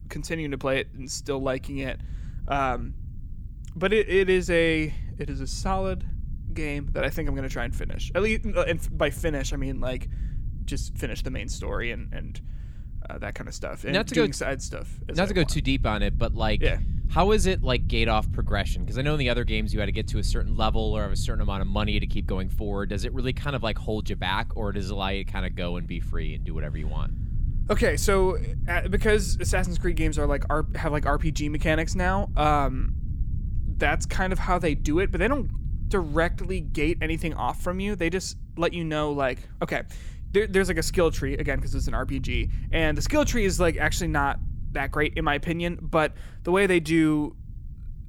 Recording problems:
low rumble; faint; throughout; 20 dB below the speech

